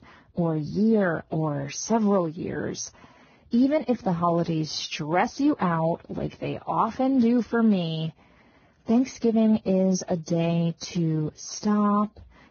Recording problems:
garbled, watery; badly; nothing above 6.5 kHz

